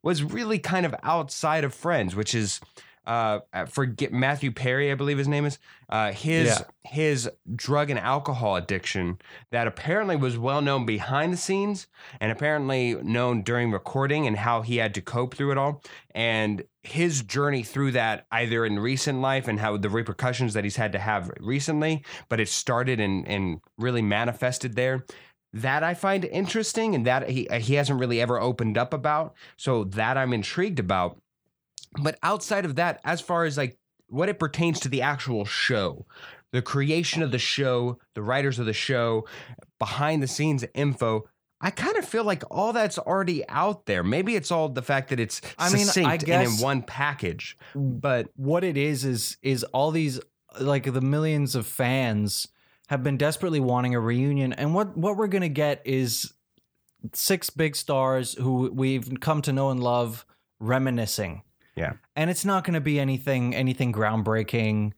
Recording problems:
none

